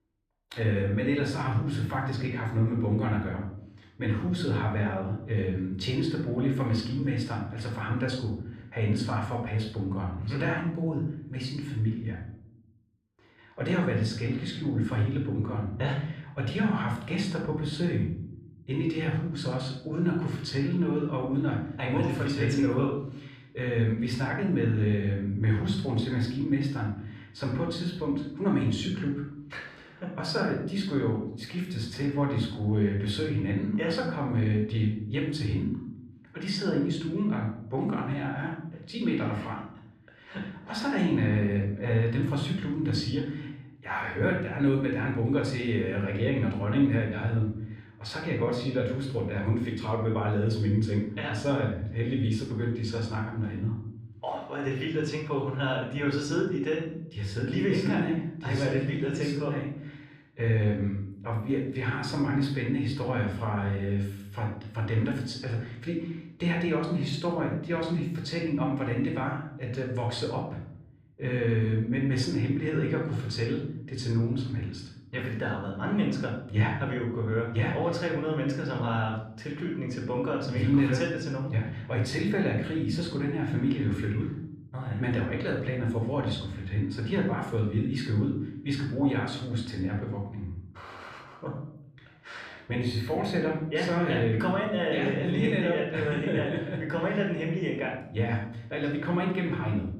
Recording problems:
room echo; noticeable; dies away in 0.7 s
off-mic speech; somewhat distant

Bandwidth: 14.5 kHz